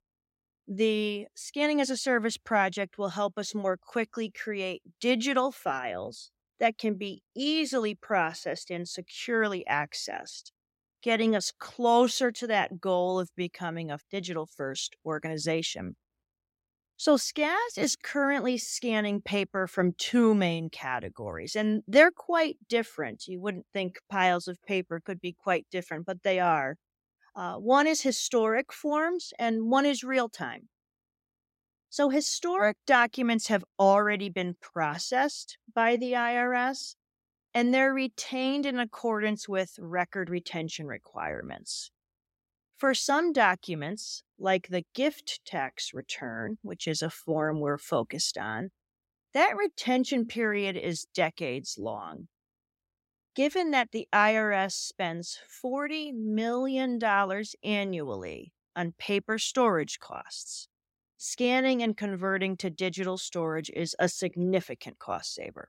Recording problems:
none

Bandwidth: 16 kHz